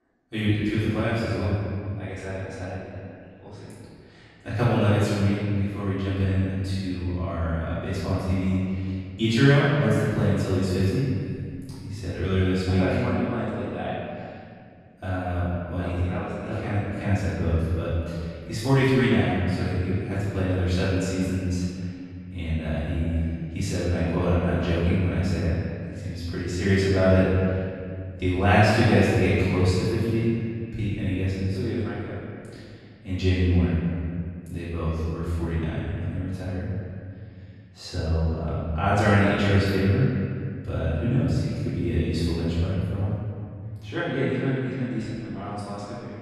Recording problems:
room echo; strong; dies away in 2 s
off-mic speech; far
echo of what is said; faint; throughout; 410 ms later, 20 dB below the speech

